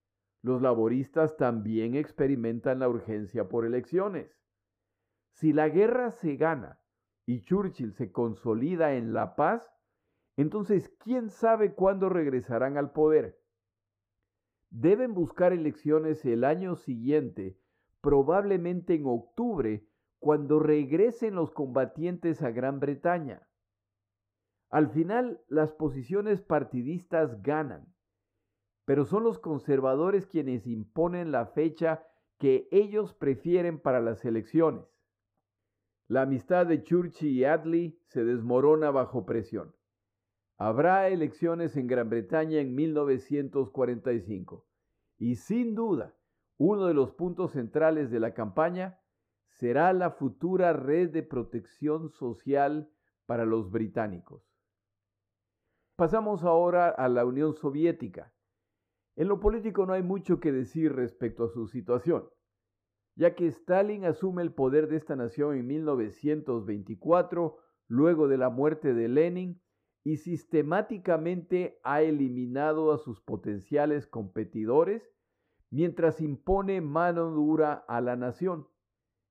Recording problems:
muffled; very; fading above 2 kHz

